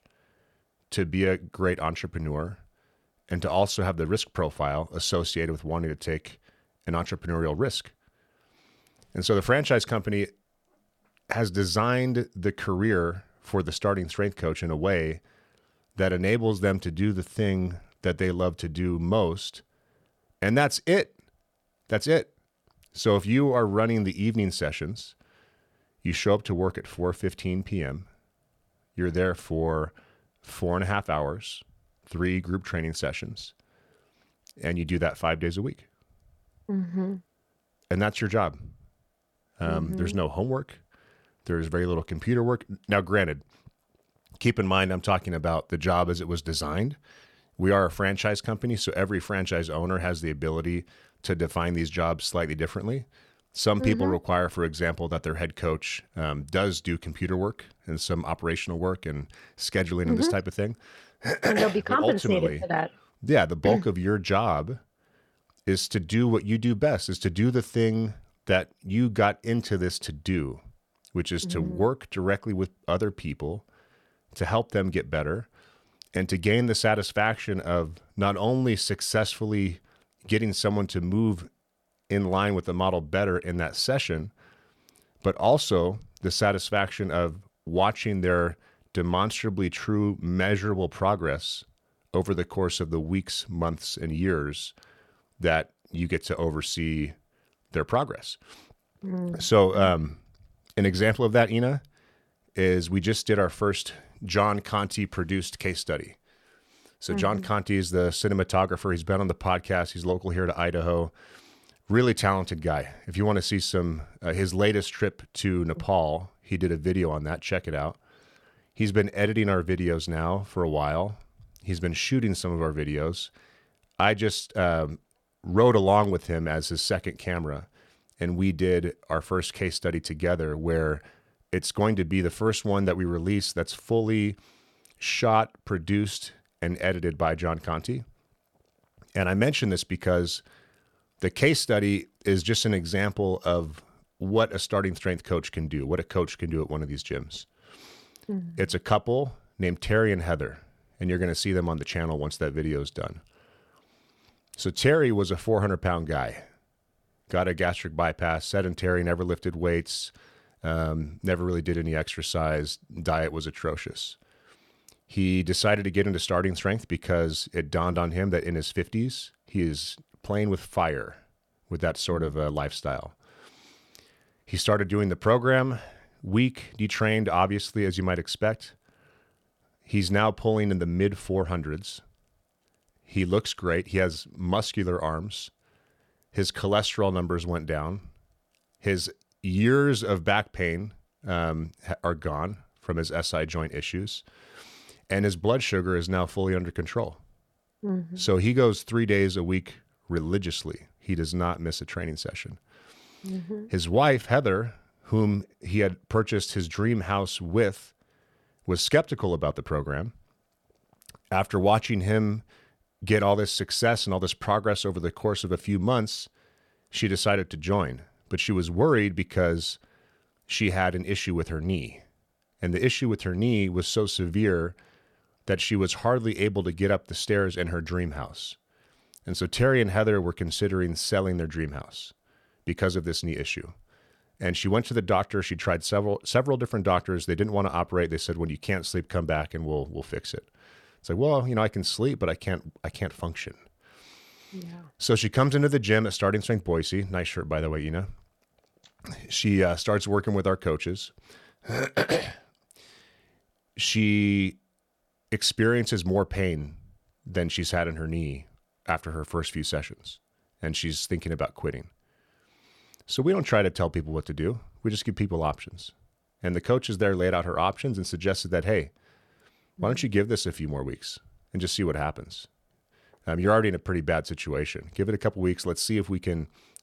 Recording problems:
none

